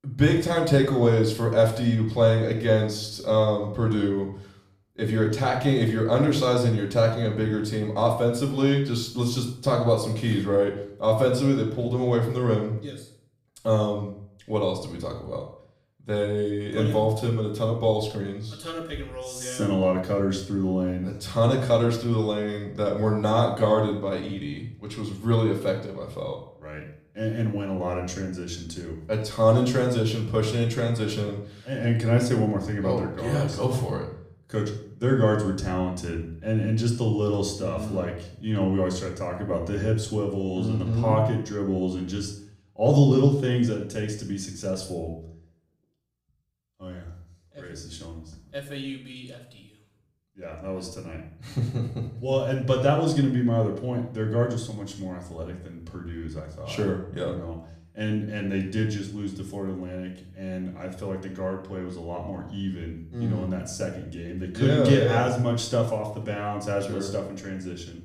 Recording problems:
off-mic speech; far
room echo; slight; dies away in 0.5 s

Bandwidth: 15 kHz